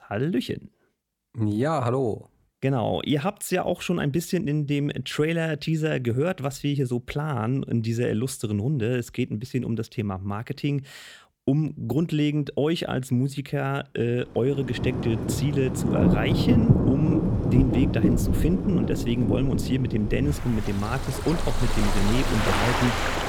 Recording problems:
rain or running water; very loud; from 14 s on; 1 dB above the speech

